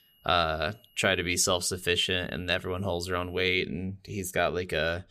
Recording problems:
high-pitched whine; faint; until 3.5 s; 3 kHz, 35 dB below the speech

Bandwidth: 15 kHz